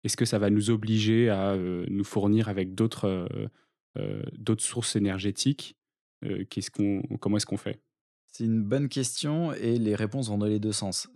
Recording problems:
none

